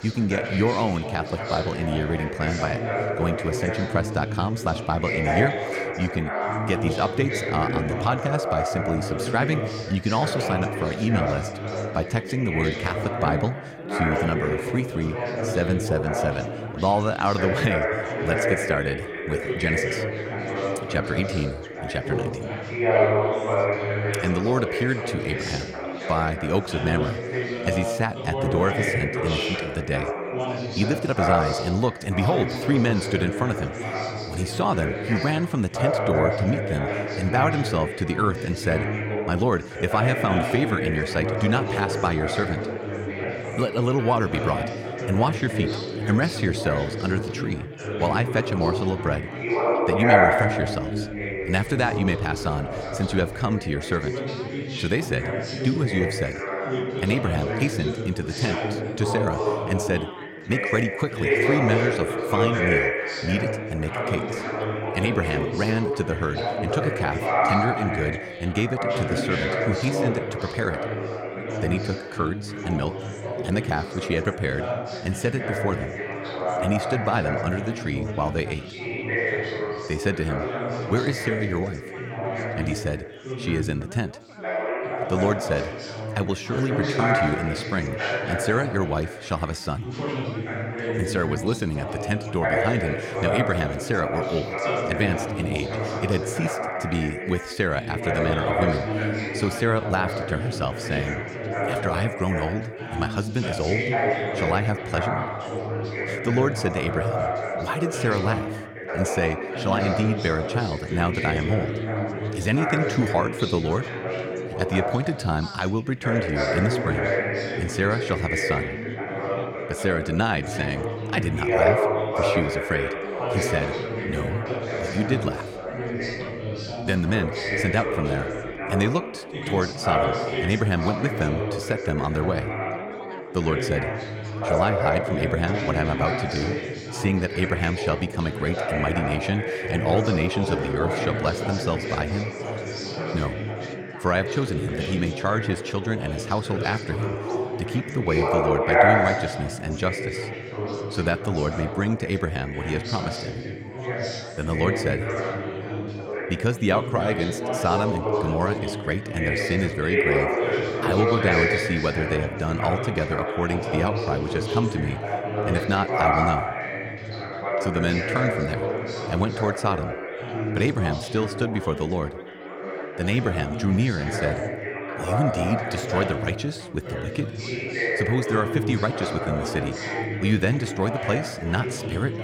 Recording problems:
chatter from many people; loud; throughout; 1 dB below the speech

